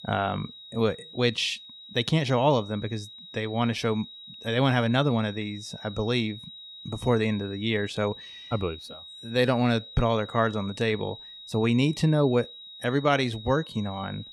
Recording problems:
high-pitched whine; noticeable; throughout; 4 kHz, 15 dB below the speech

